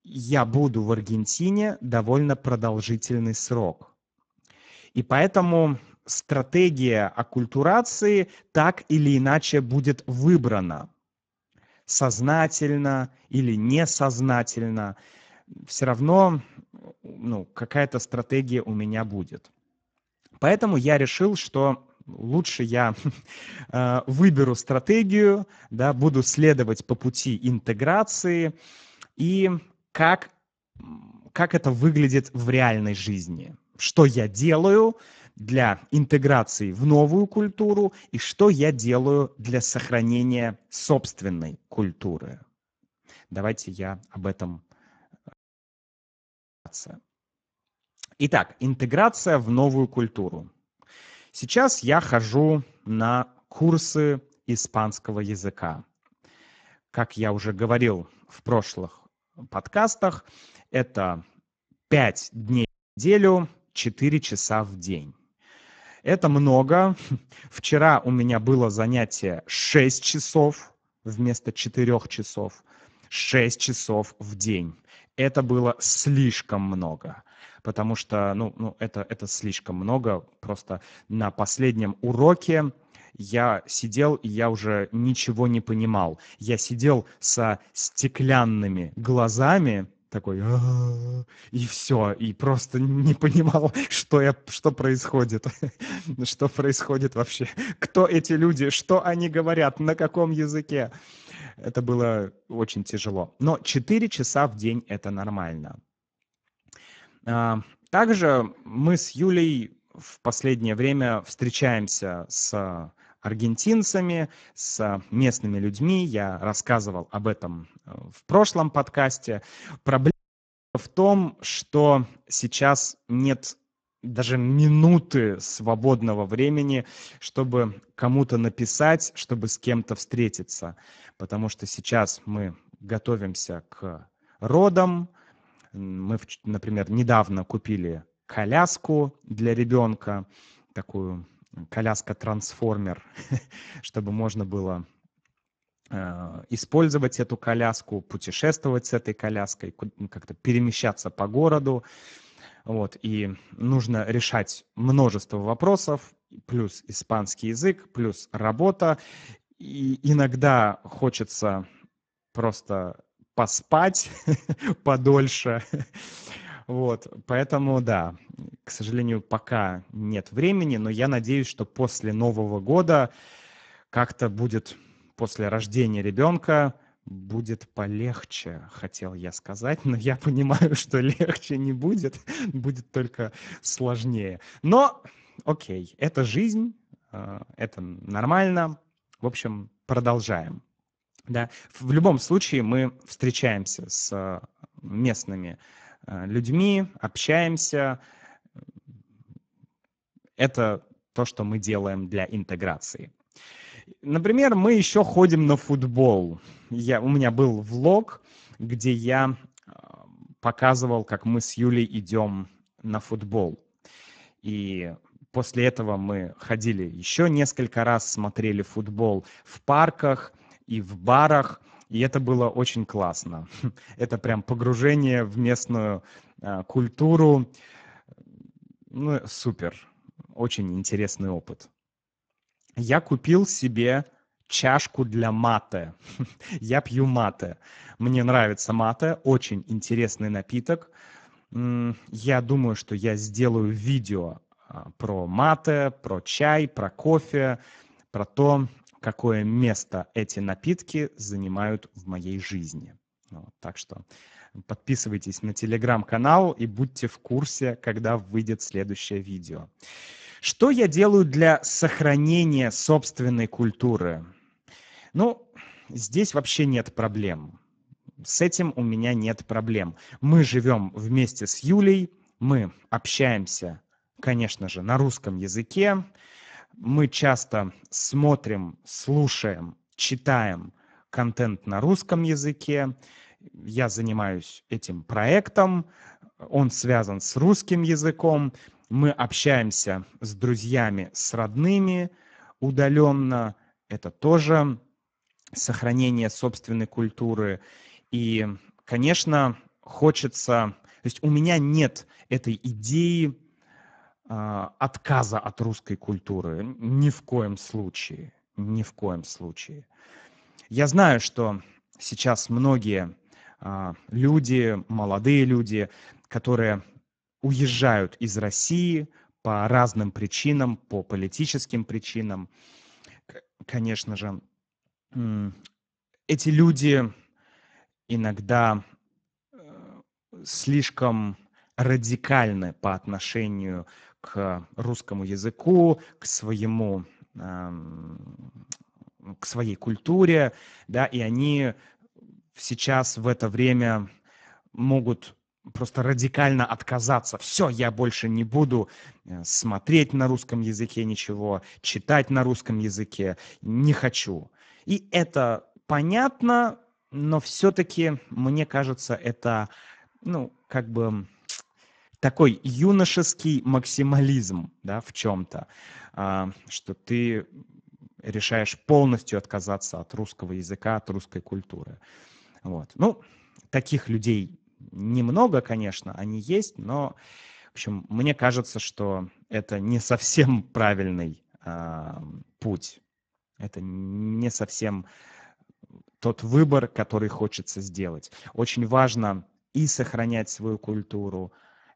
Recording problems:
garbled, watery; badly; nothing above 7.5 kHz
audio cutting out; at 45 s for 1.5 s, at 1:03 and at 2:00 for 0.5 s
audio stuttering; at 5:38

